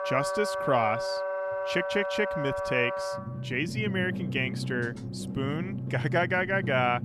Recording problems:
background music; loud; throughout; 3 dB below the speech

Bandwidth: 15 kHz